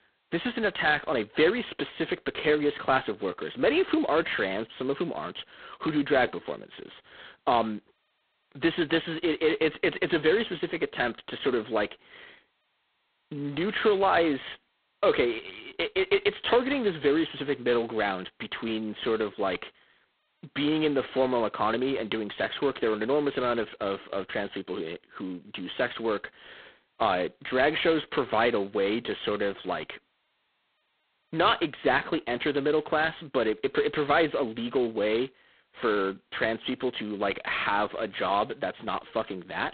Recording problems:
phone-call audio; poor line; nothing above 4 kHz

